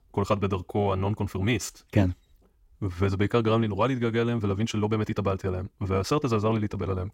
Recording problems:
wrong speed, natural pitch; too fast; 1.5 times normal speed

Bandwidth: 16 kHz